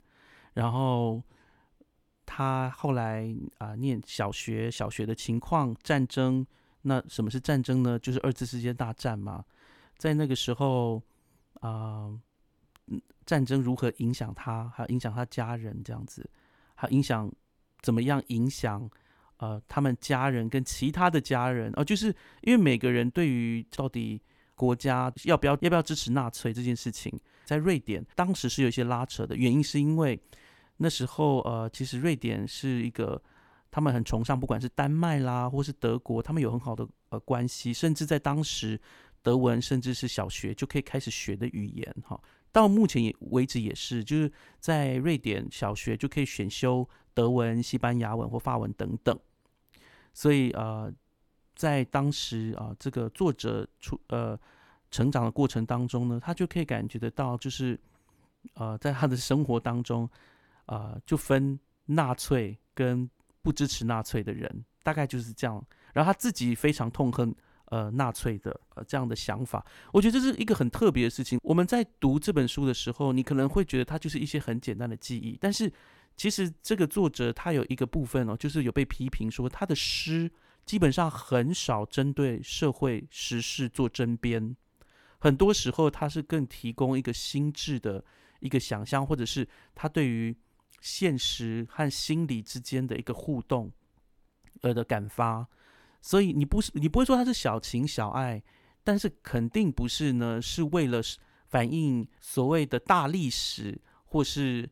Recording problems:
none

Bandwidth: 18 kHz